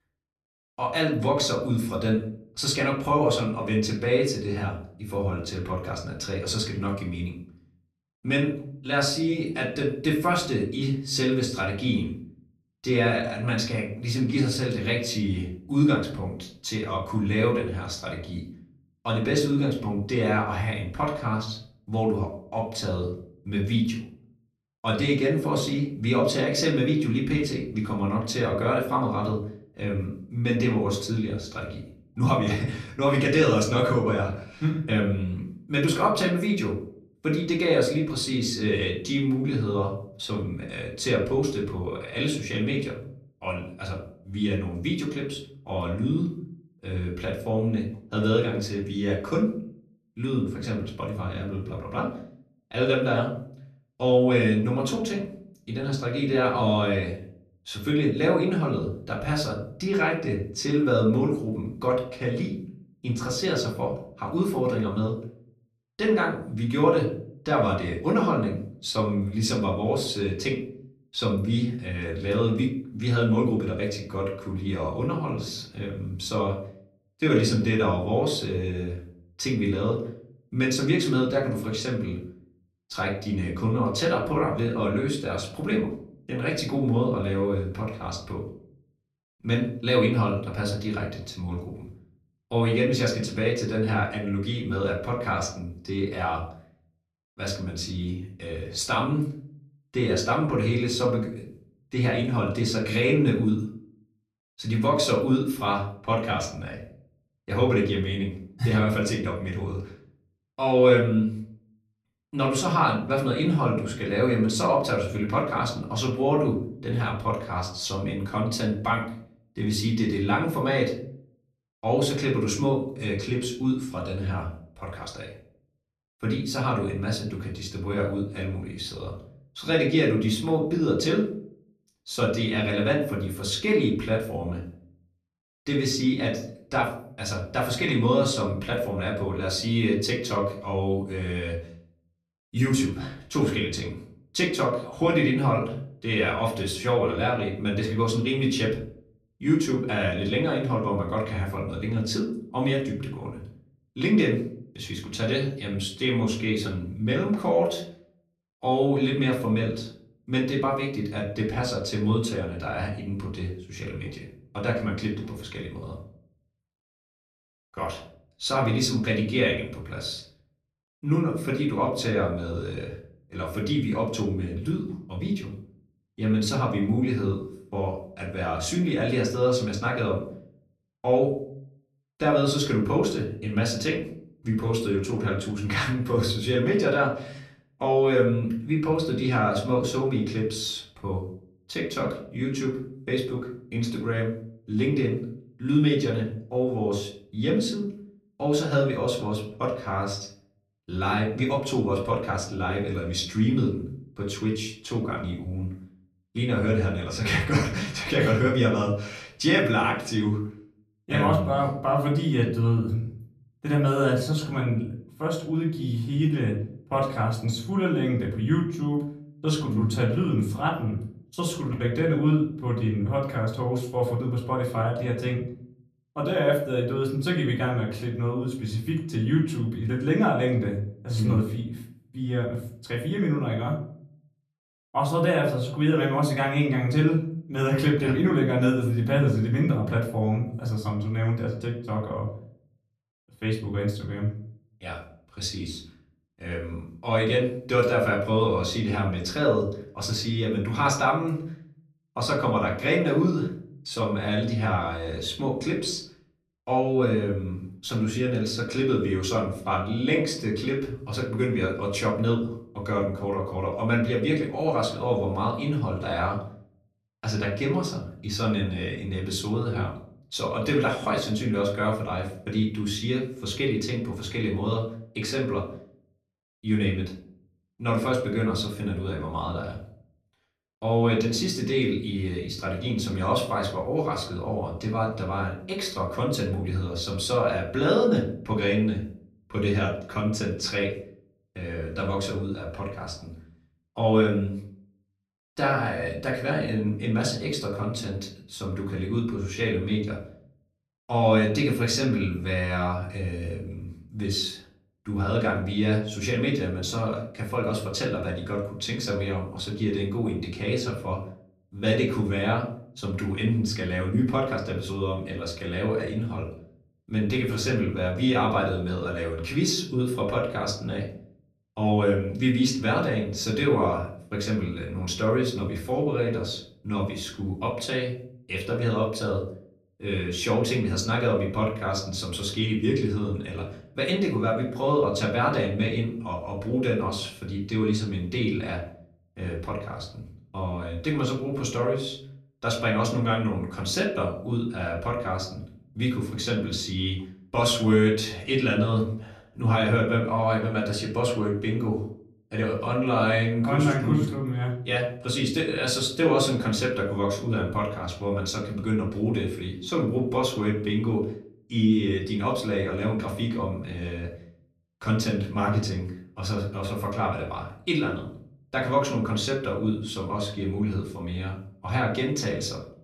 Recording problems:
off-mic speech; far
room echo; slight; dies away in 0.5 s

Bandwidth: 13.5 kHz